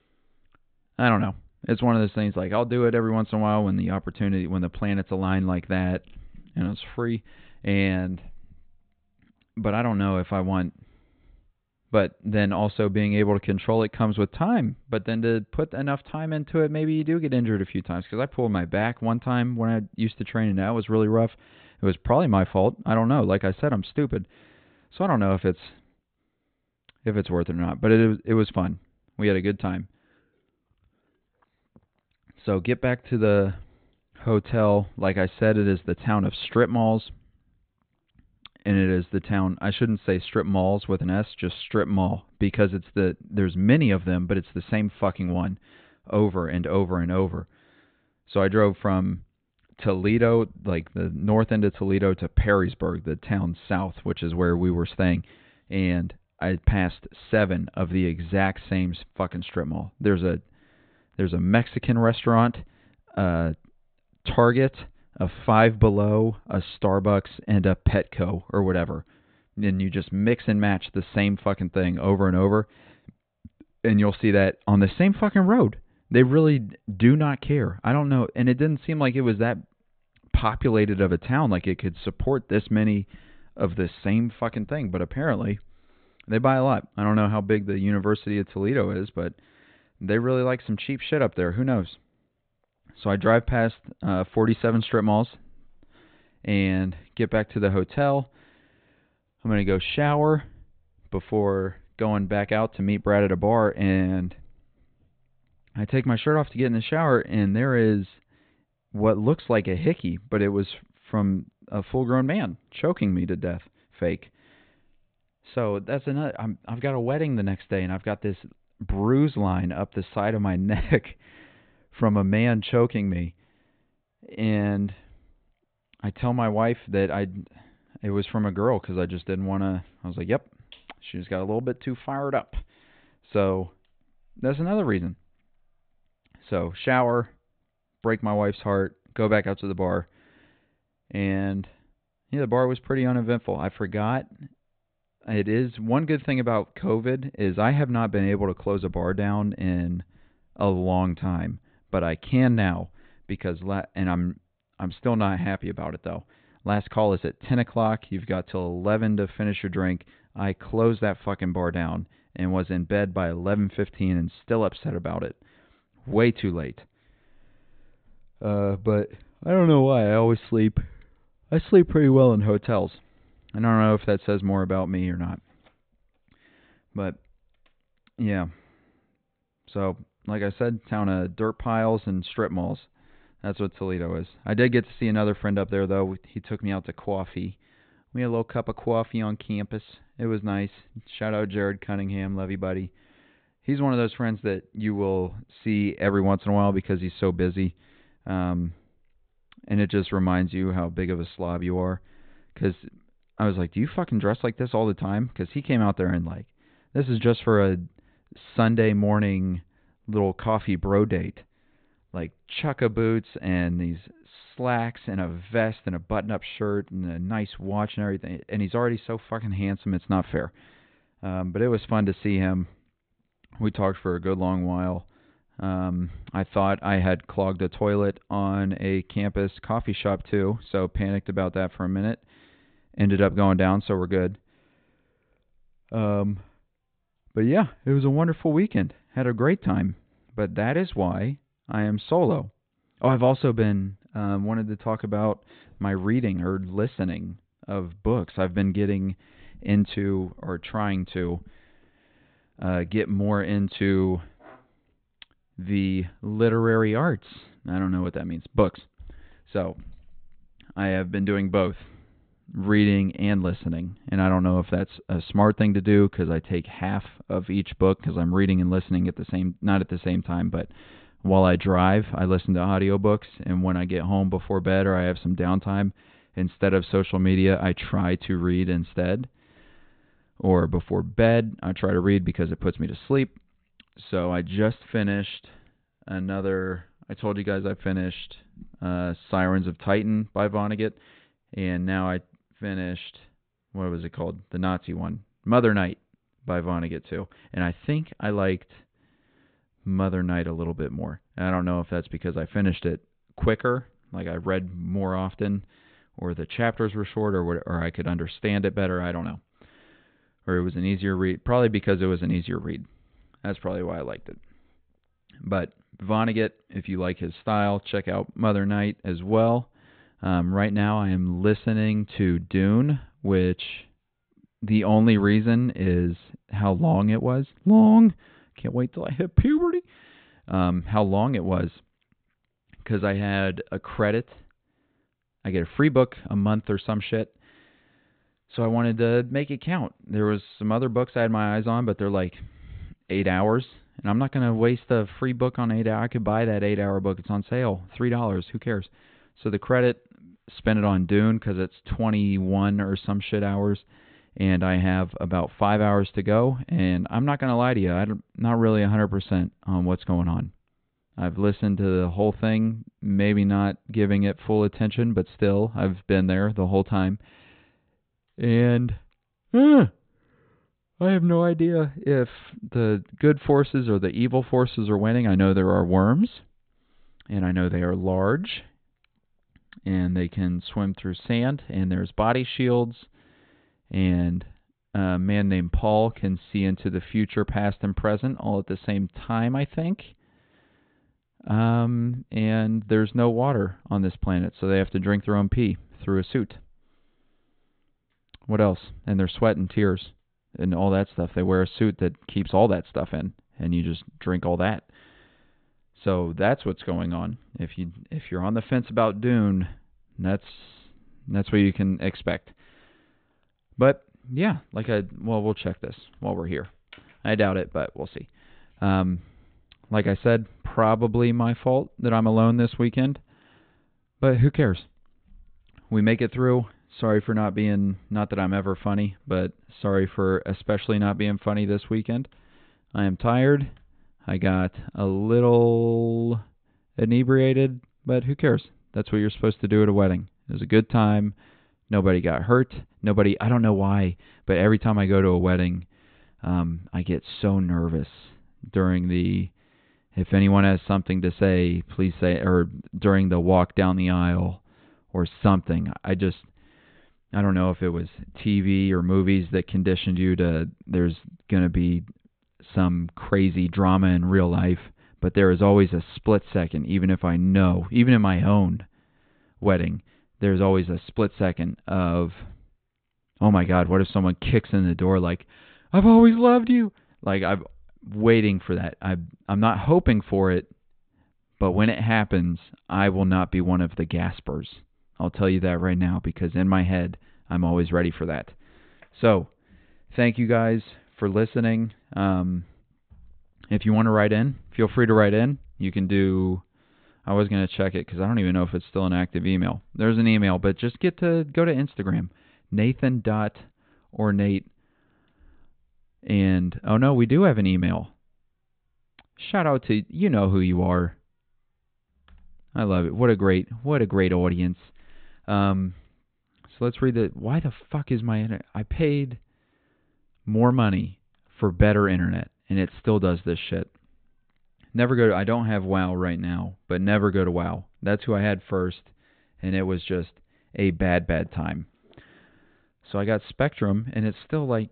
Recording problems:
high frequencies cut off; severe; nothing above 4 kHz

